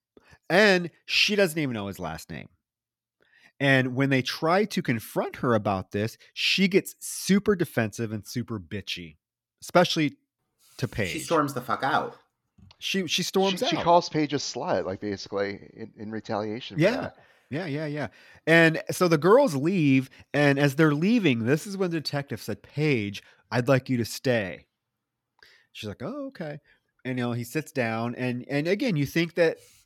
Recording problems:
none

